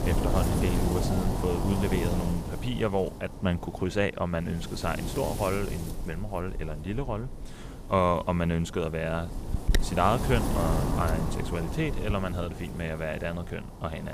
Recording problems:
wind noise on the microphone; heavy; 6 dB below the speech
abrupt cut into speech; at the end

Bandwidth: 15 kHz